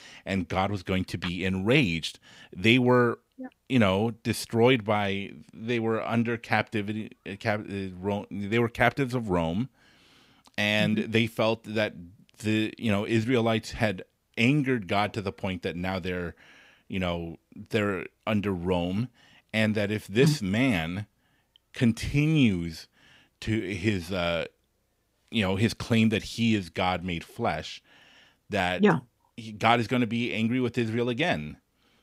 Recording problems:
none

